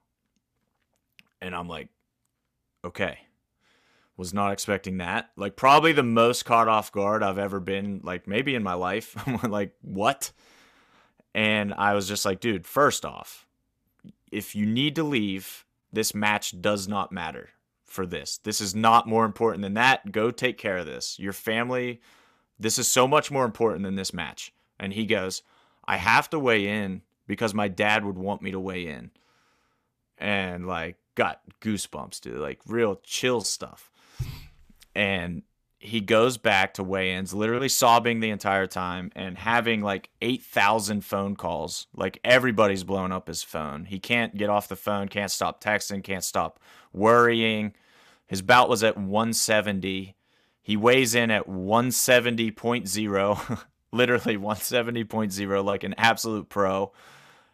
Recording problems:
none

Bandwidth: 14.5 kHz